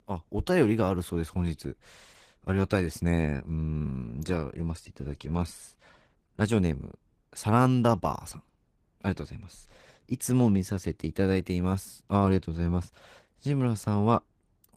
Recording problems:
garbled, watery; slightly; nothing above 14.5 kHz

